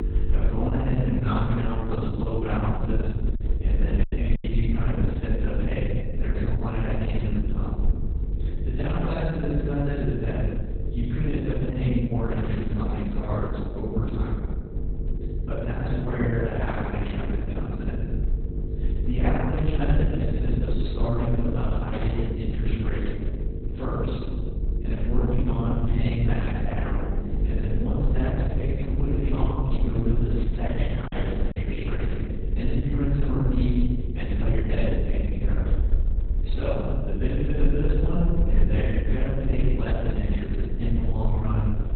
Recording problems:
room echo; strong; dies away in 1.4 s
off-mic speech; far
garbled, watery; badly; nothing above 4 kHz
electrical hum; noticeable; throughout; 50 Hz, 10 dB below the speech
low rumble; noticeable; throughout; 15 dB below the speech
choppy; very; at 4 s and at 31 s; 11% of the speech affected

